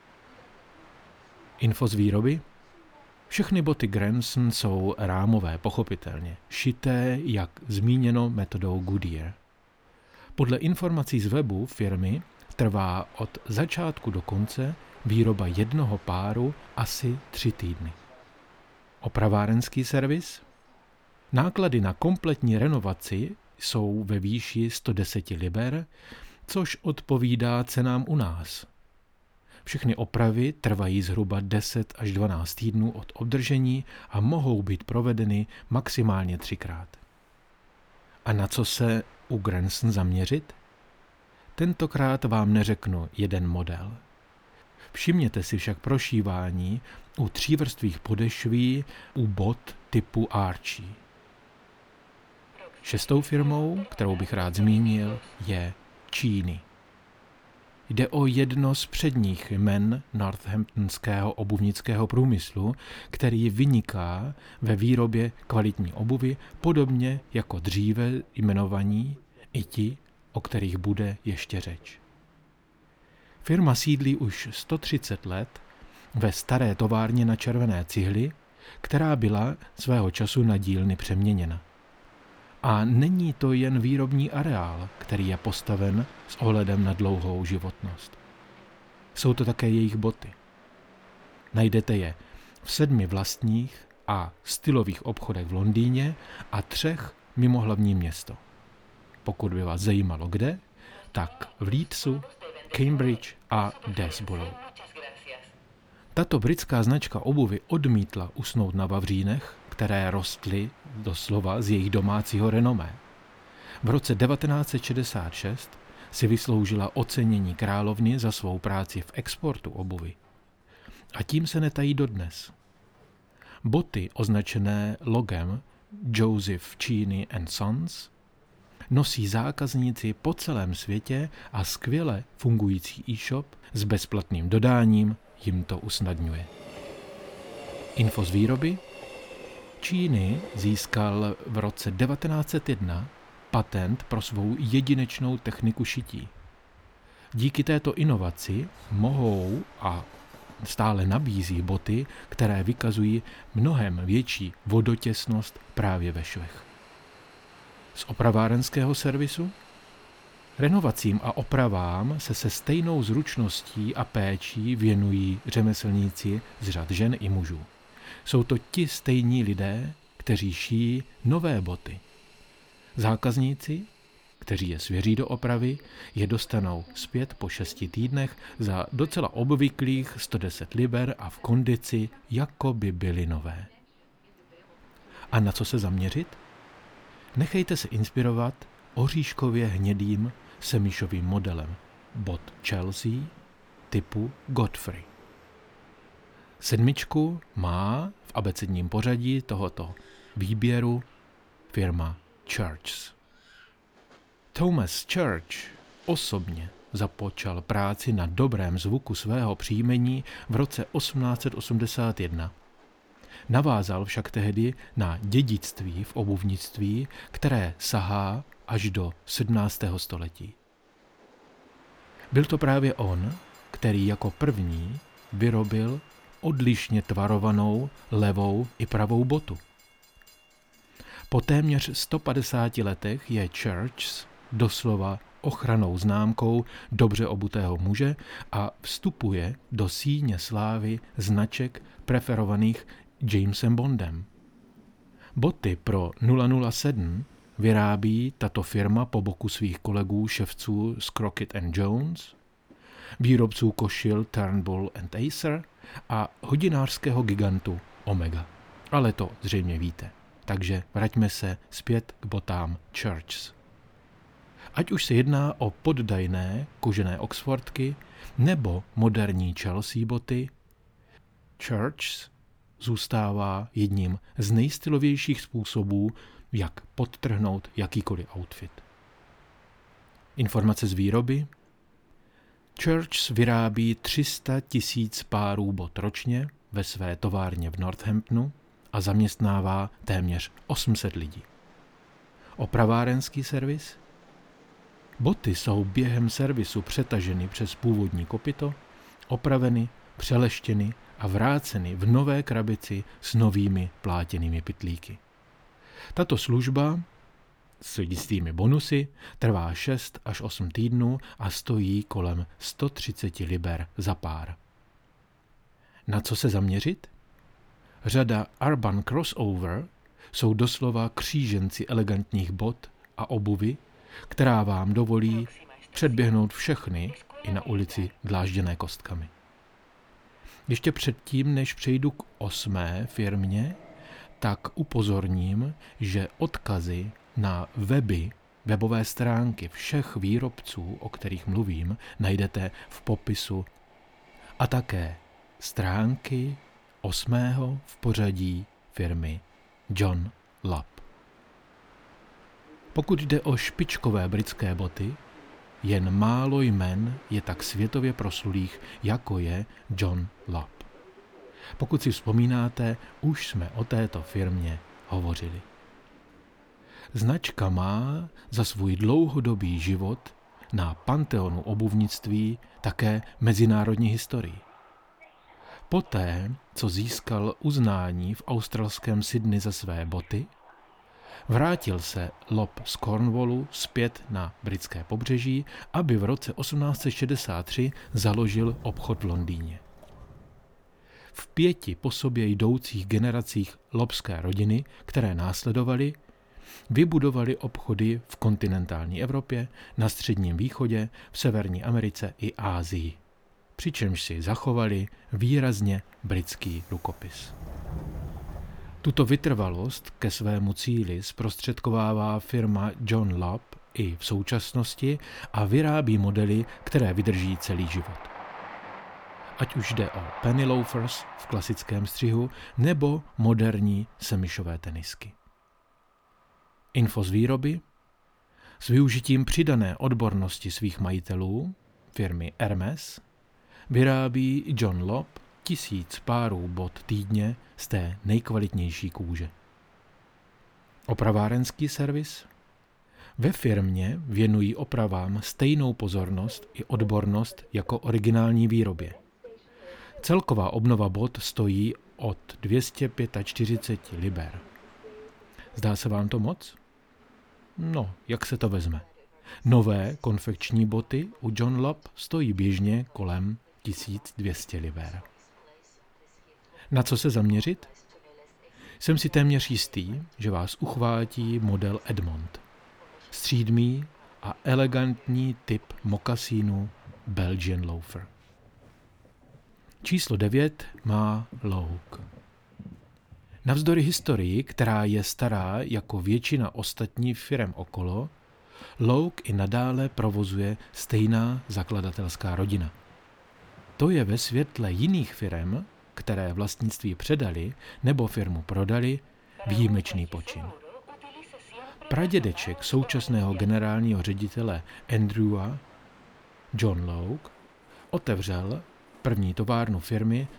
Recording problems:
train or aircraft noise; faint; throughout; 25 dB below the speech

